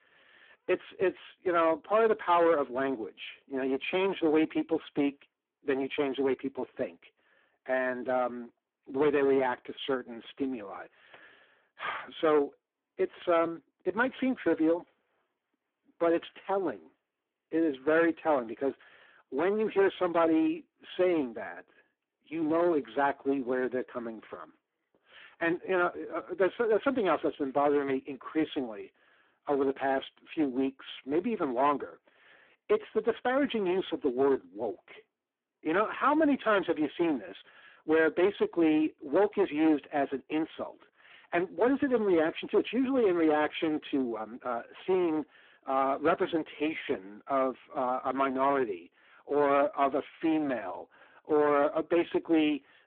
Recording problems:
phone-call audio; poor line
distortion; slight; 7% of the sound clipped

